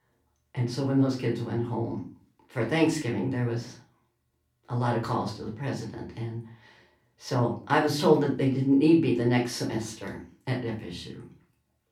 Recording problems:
off-mic speech; far
room echo; slight; dies away in 0.3 s

